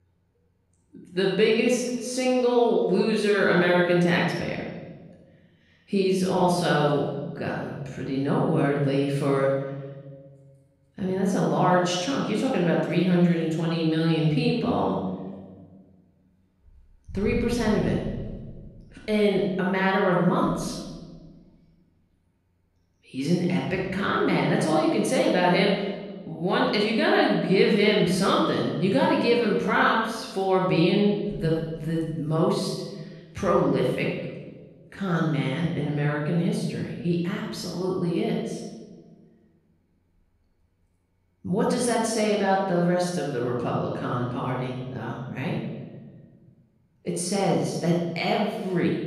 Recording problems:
off-mic speech; far
room echo; noticeable; dies away in 1.3 s

